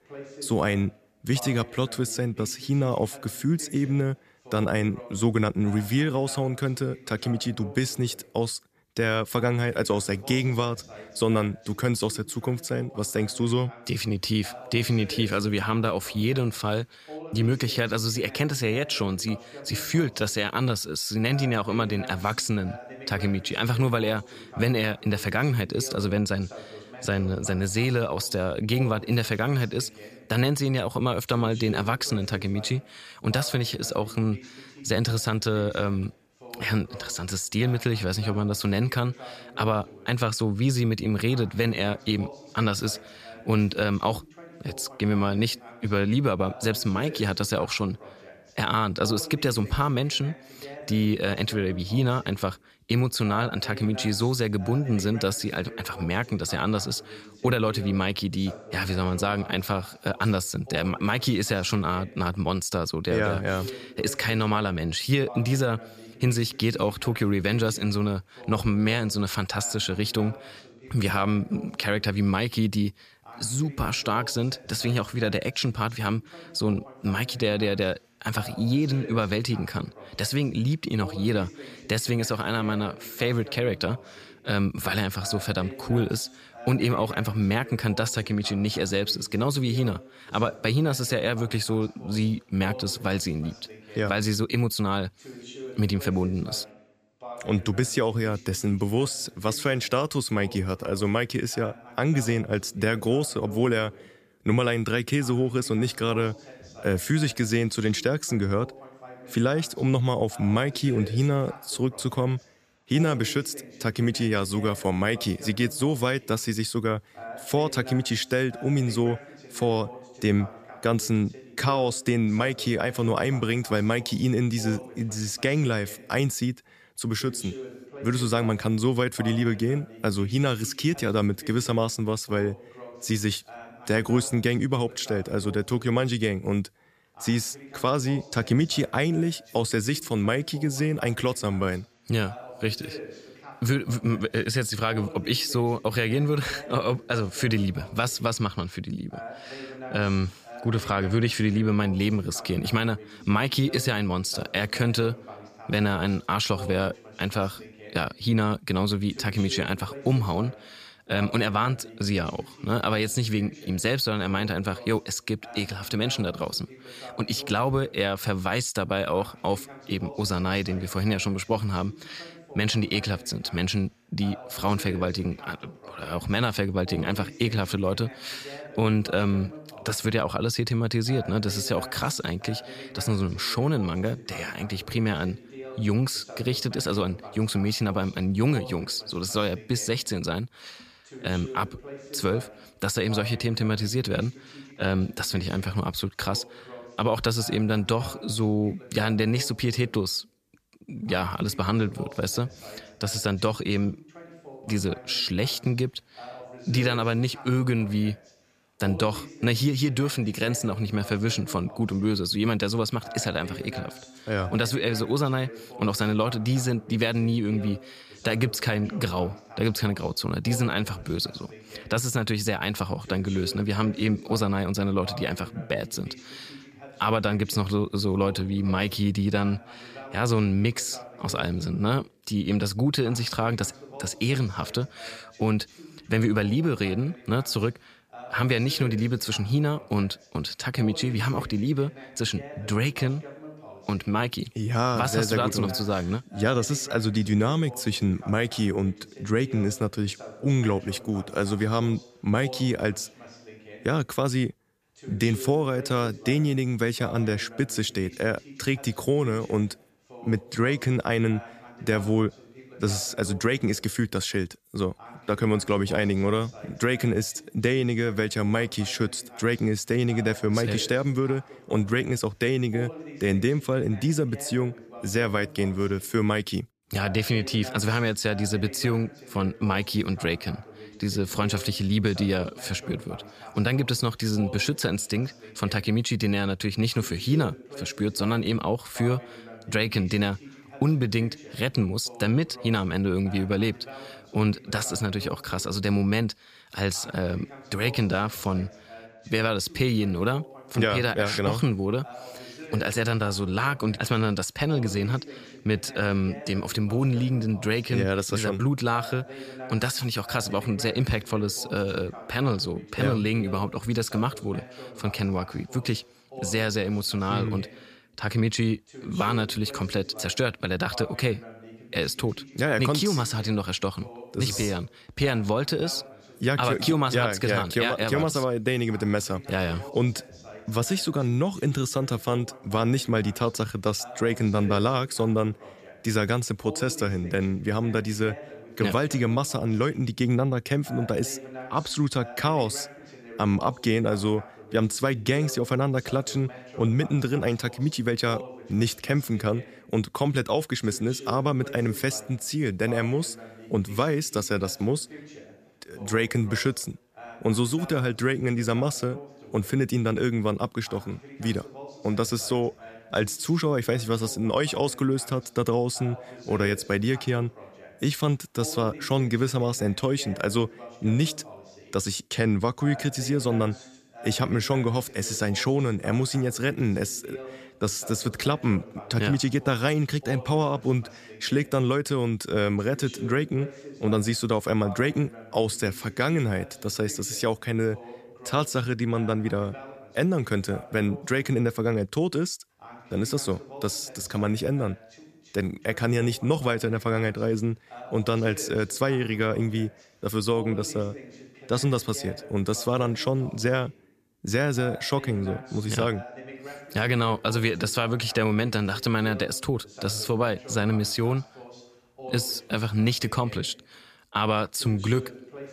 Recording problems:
voice in the background; noticeable; throughout; 20 dB below the speech

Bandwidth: 14.5 kHz